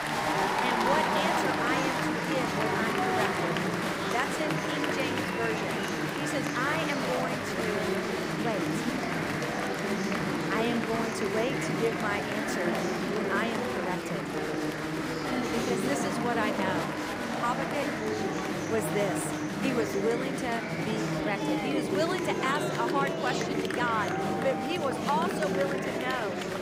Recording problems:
murmuring crowd; very loud; throughout; 3 dB above the speech

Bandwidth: 15.5 kHz